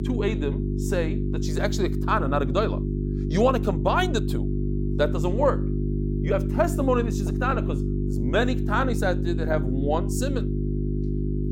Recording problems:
electrical hum; loud; throughout; 50 Hz, 8 dB below the speech

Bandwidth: 16 kHz